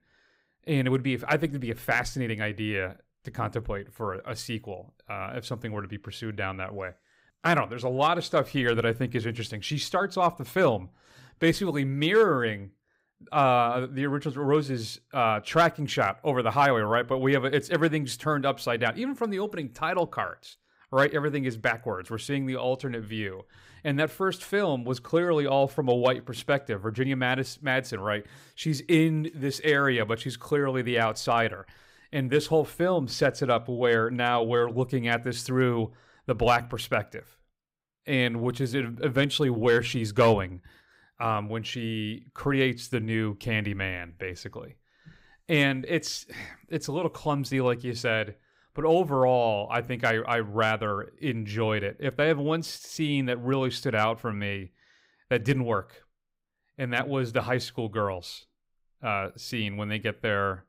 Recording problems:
none

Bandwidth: 15.5 kHz